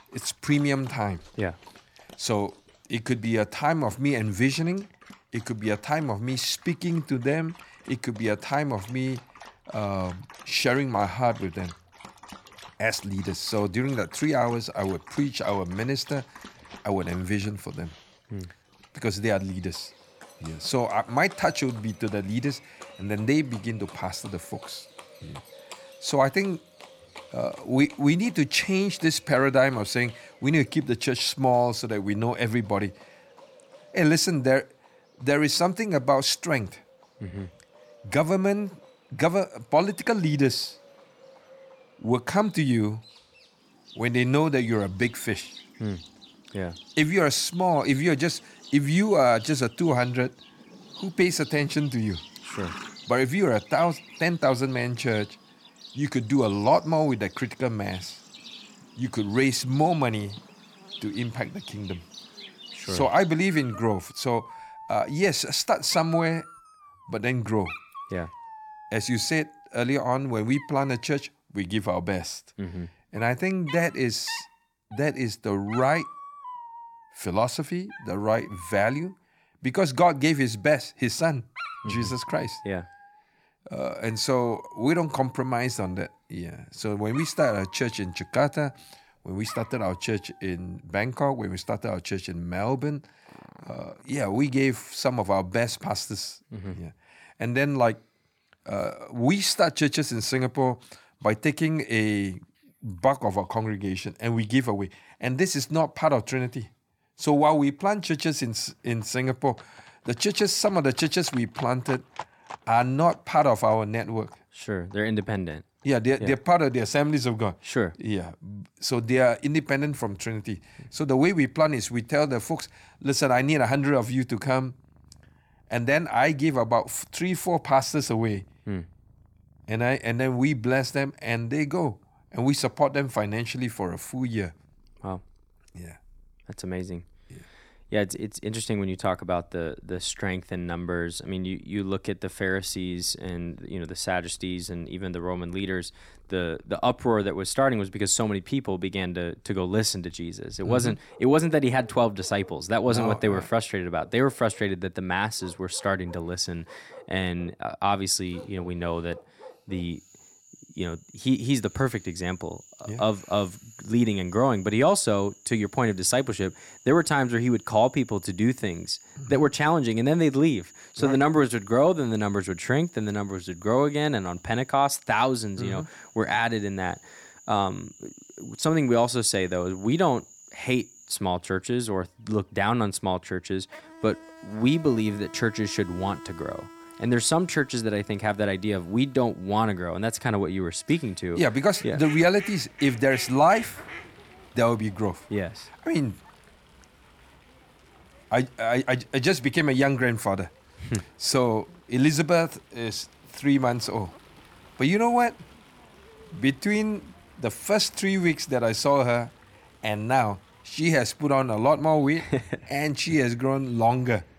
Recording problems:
animal sounds; faint; throughout; 20 dB below the speech

